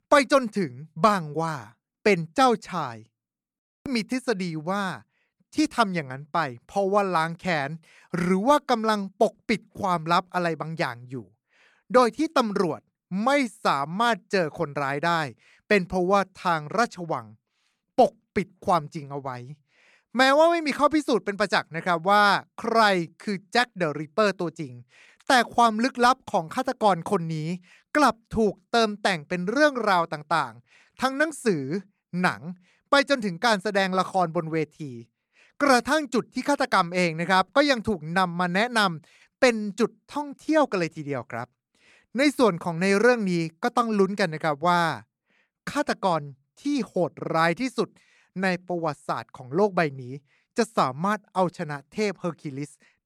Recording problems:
none

